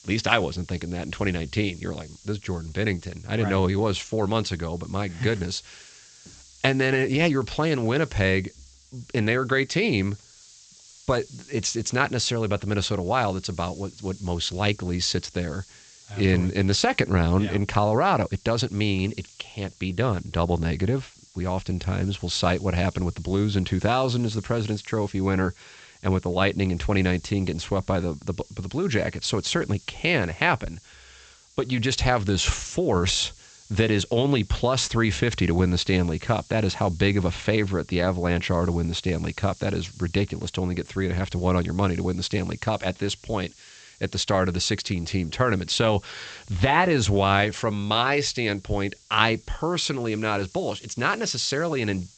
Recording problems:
high frequencies cut off; noticeable; nothing above 8 kHz
hiss; faint; throughout; 25 dB below the speech

